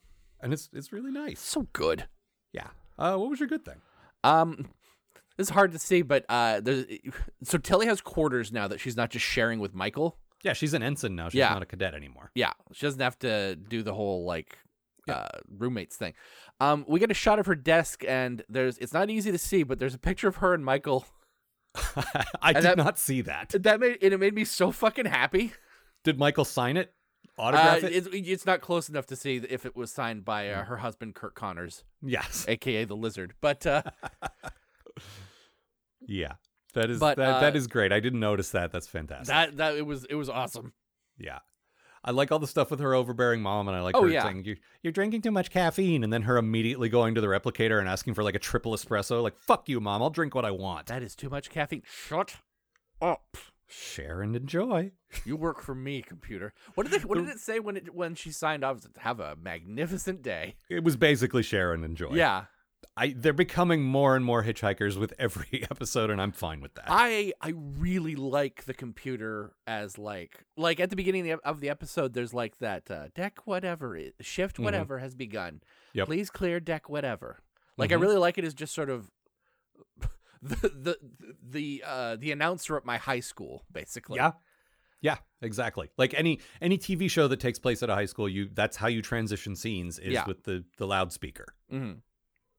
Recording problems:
none

